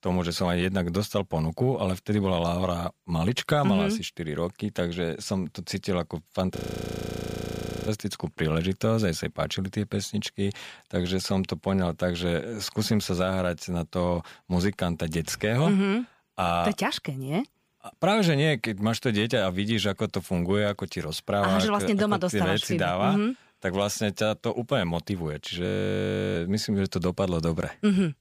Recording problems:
audio freezing; at 6.5 s for 1.5 s and at 26 s for 0.5 s

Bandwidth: 15 kHz